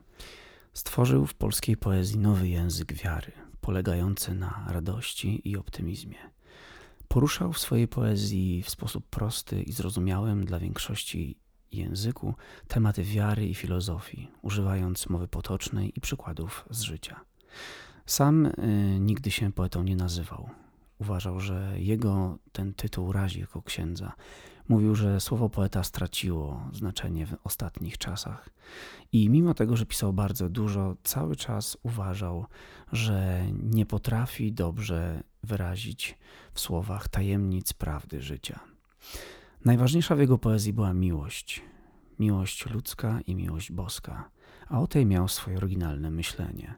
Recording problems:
none

